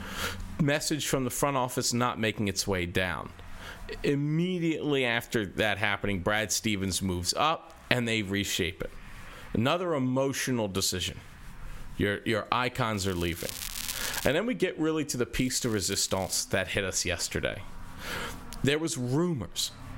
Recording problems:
squashed, flat; heavily
crackling; loud; from 13 to 14 s and at 15 s; 9 dB below the speech

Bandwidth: 16 kHz